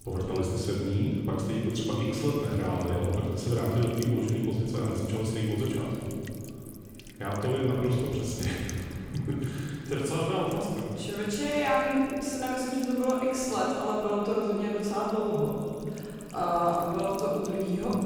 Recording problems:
room echo; strong; dies away in 2.4 s
off-mic speech; far
echo of what is said; noticeable; from 13 s on; 190 ms later, 15 dB below the speech
electrical hum; noticeable; throughout; 50 Hz, 20 dB below the speech

